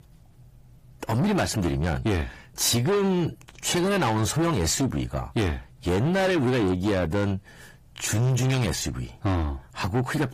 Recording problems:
distortion; heavy; 7 dB below the speech
garbled, watery; slightly; nothing above 15 kHz

